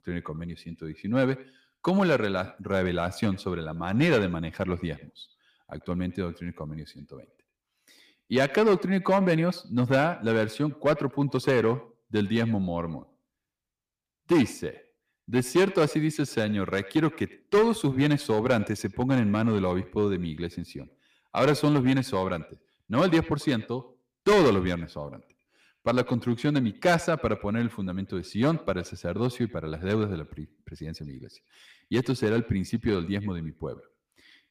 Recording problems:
echo of what is said; faint; throughout; 90 ms later, 20 dB below the speech
distortion; slight; 3% of the sound clipped

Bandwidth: 15 kHz